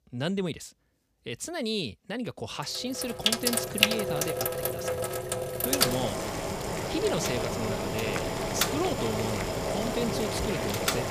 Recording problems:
household noises; very loud; from 3 s on; 4 dB above the speech

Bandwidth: 15 kHz